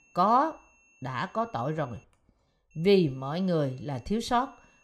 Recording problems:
high-pitched whine; faint; until 2 s and from 2.5 s on; 2.5 kHz, 35 dB below the speech

